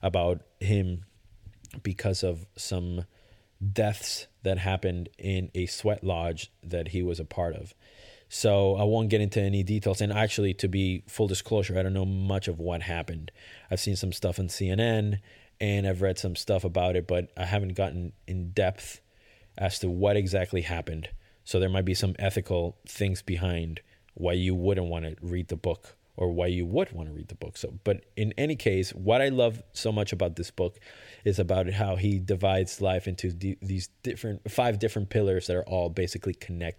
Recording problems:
none

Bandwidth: 17 kHz